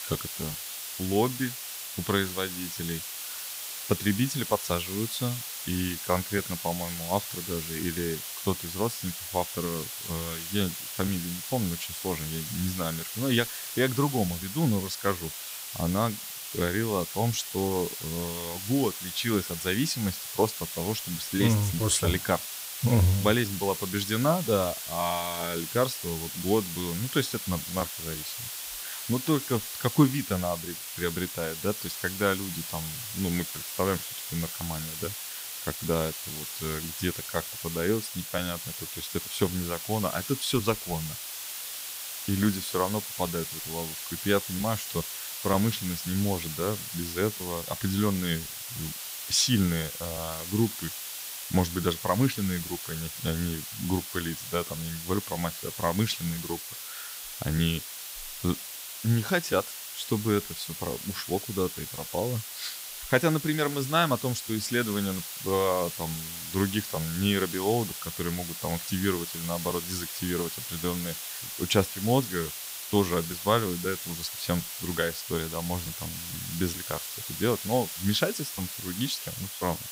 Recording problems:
hiss; loud; throughout; 5 dB below the speech

